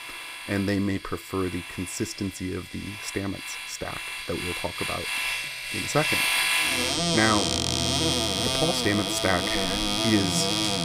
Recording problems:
household noises; very loud; throughout; 4 dB above the speech

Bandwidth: 15 kHz